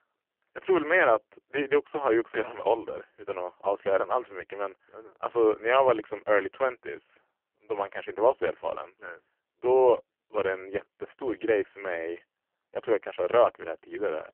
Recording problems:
phone-call audio; poor line; nothing above 3 kHz

